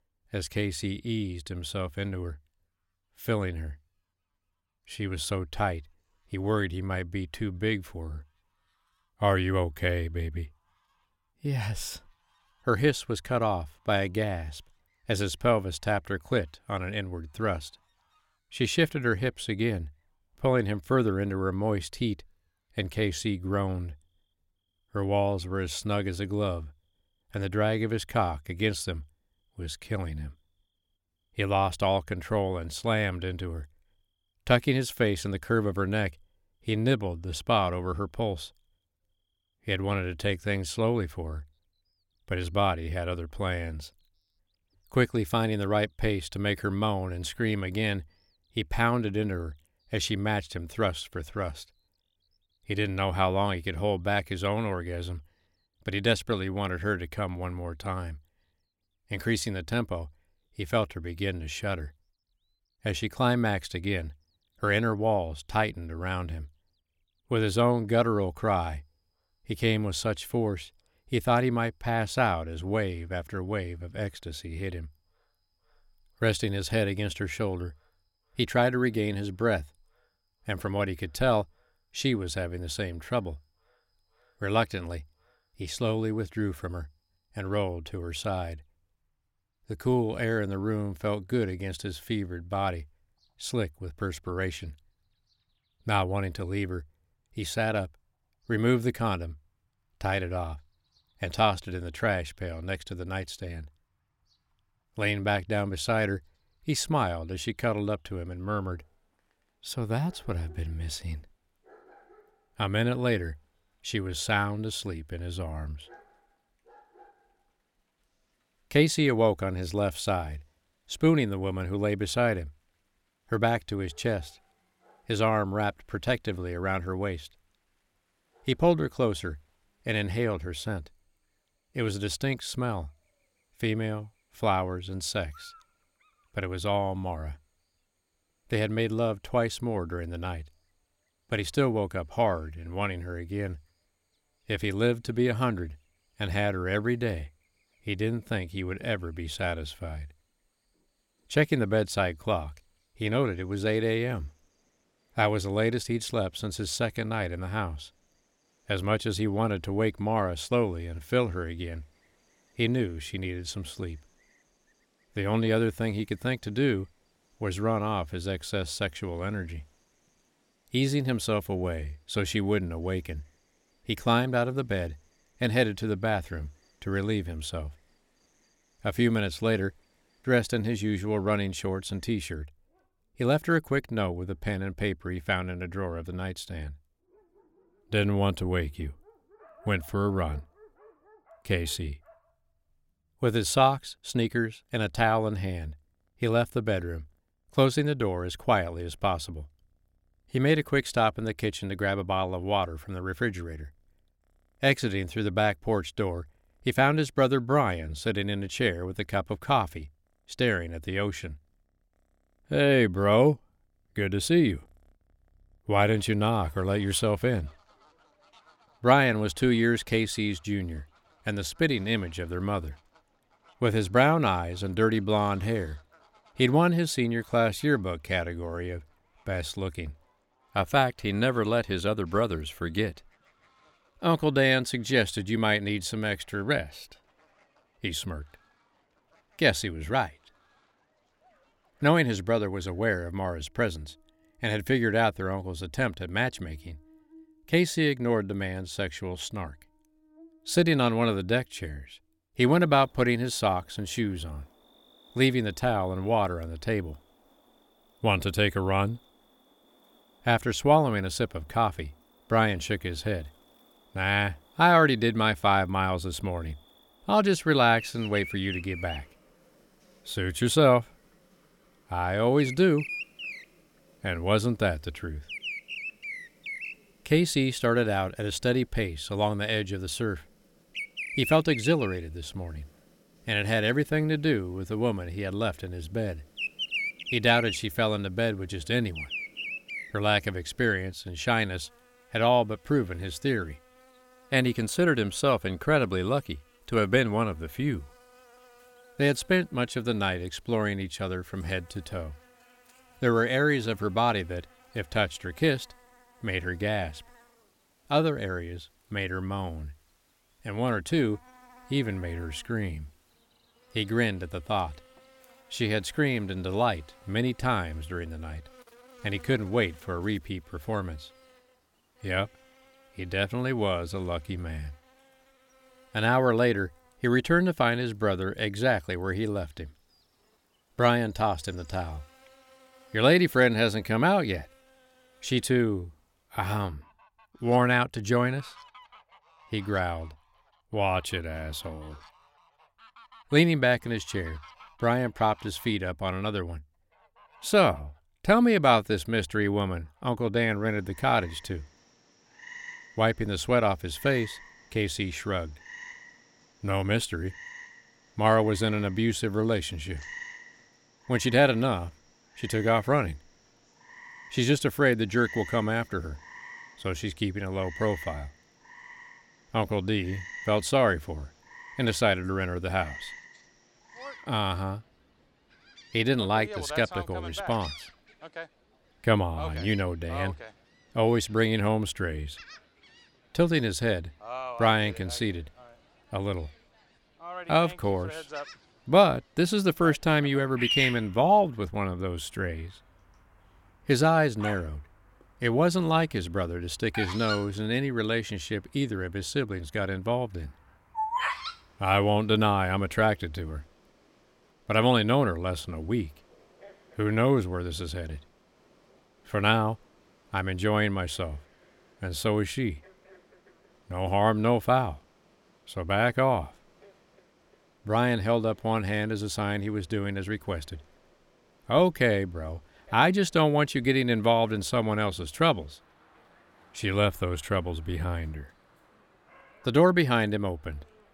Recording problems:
animal sounds; noticeable; throughout; 15 dB below the speech

